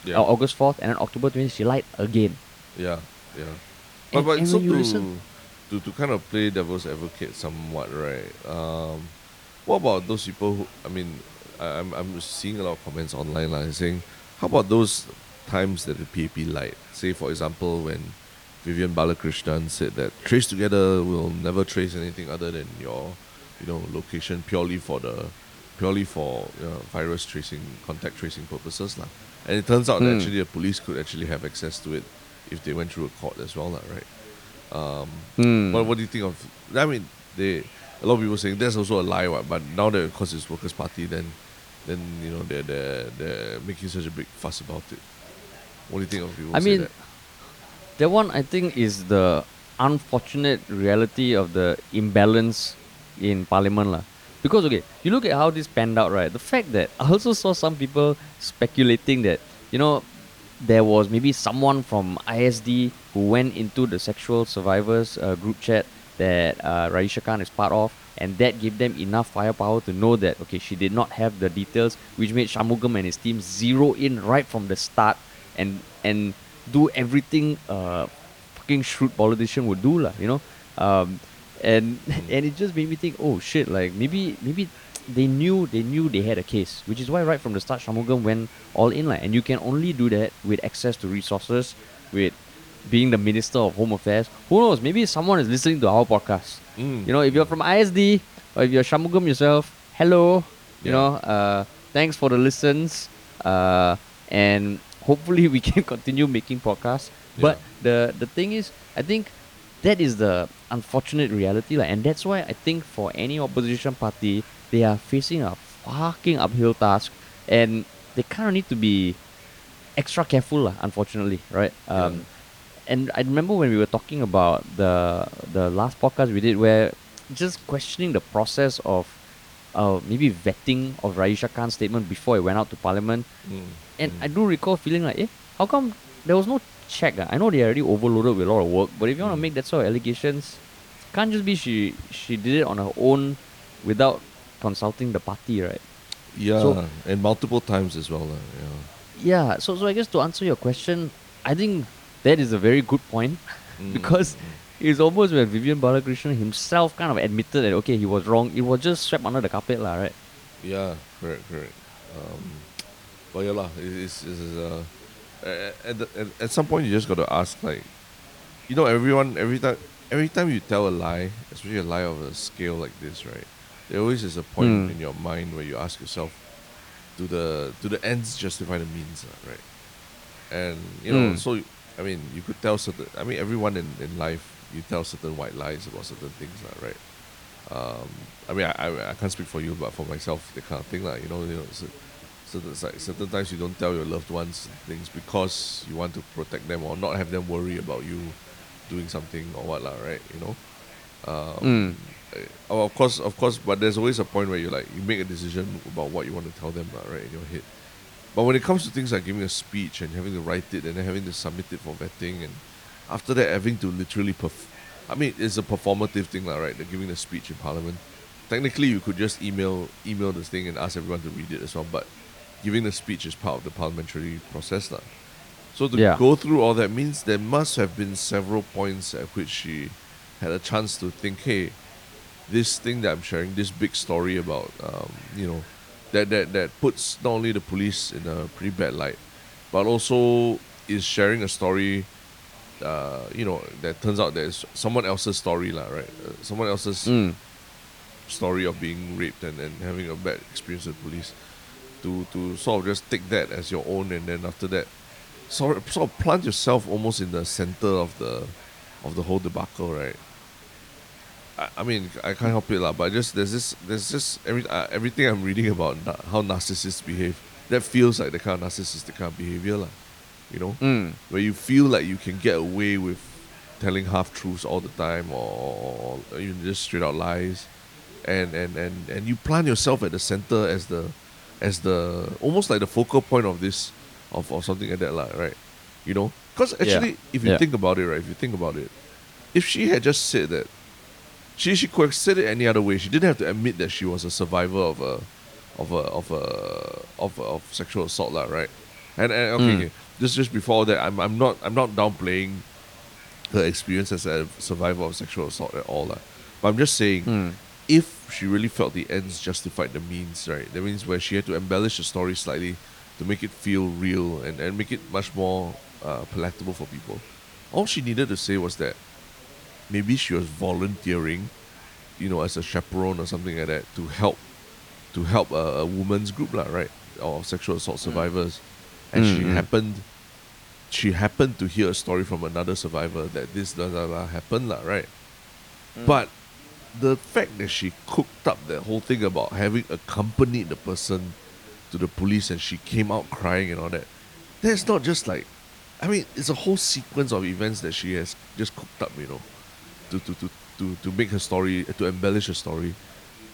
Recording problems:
voice in the background; faint; throughout; 30 dB below the speech
hiss; faint; throughout; 20 dB below the speech

